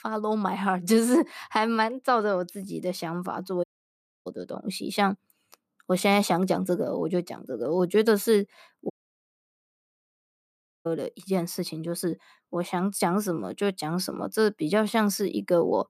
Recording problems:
audio cutting out; at 3.5 s for 0.5 s and at 9 s for 2 s

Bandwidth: 14.5 kHz